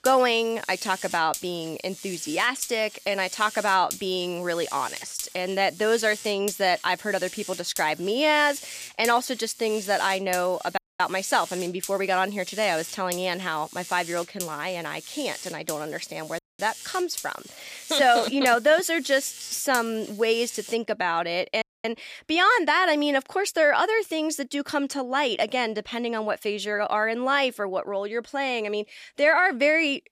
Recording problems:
electrical hum; noticeable; until 21 s; 50 Hz, 15 dB below the speech
audio cutting out; at 11 s, at 16 s and at 22 s

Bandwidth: 14.5 kHz